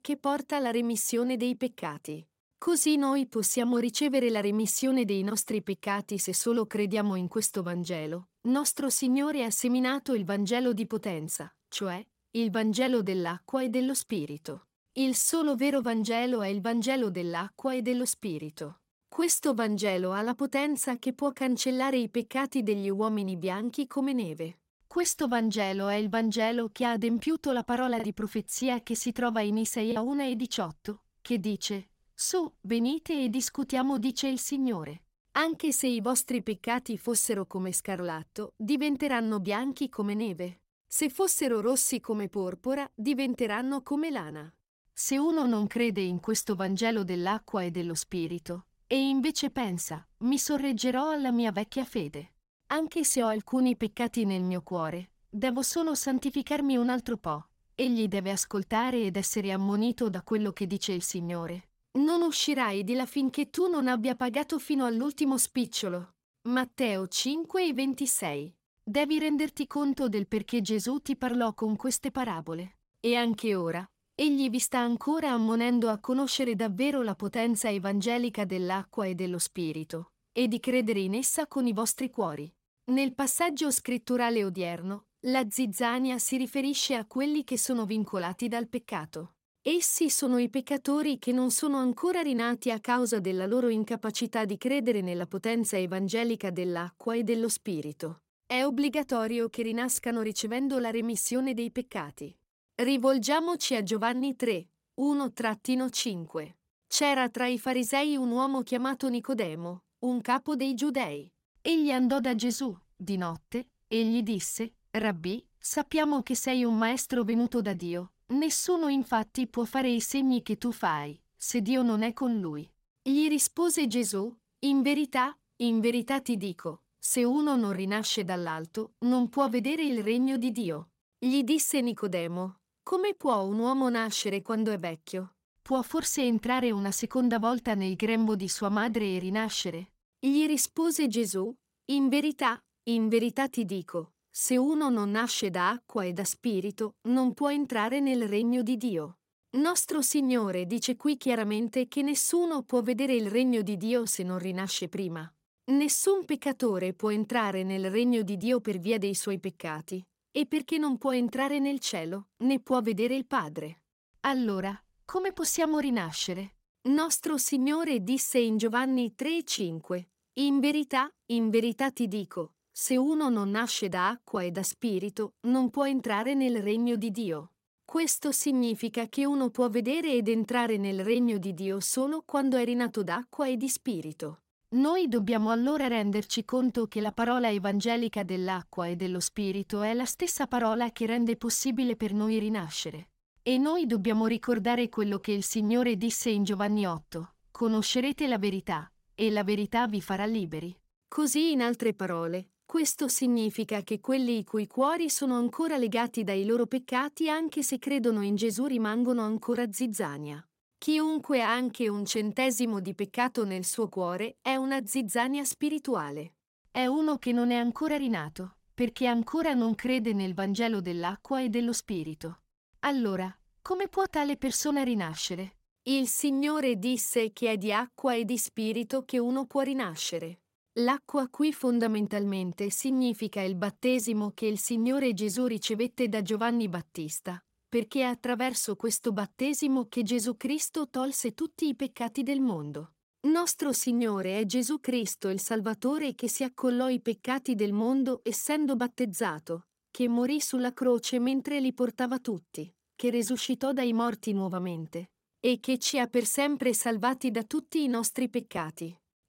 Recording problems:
choppy; occasionally; from 28 to 30 s; 2% of the speech affected

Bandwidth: 16 kHz